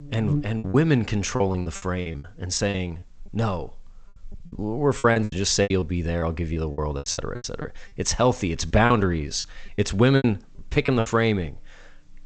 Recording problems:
garbled, watery; slightly; nothing above 8 kHz
electrical hum; noticeable; throughout; 50 Hz, 15 dB below the speech
choppy; very; 15% of the speech affected

